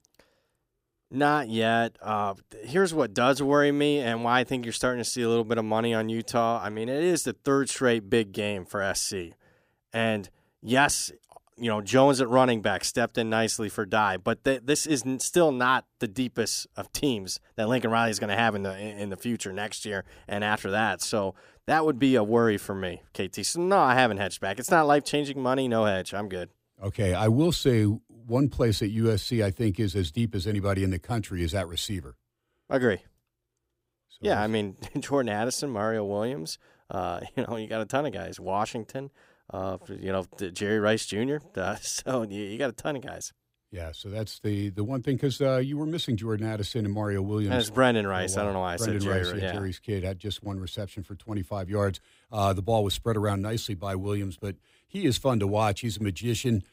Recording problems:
none

